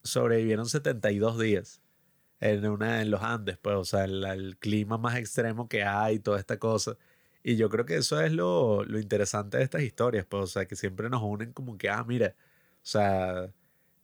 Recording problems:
none

